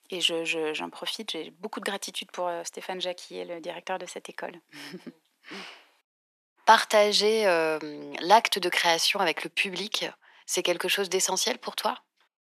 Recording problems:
thin; very; fading below 500 Hz

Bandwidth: 14 kHz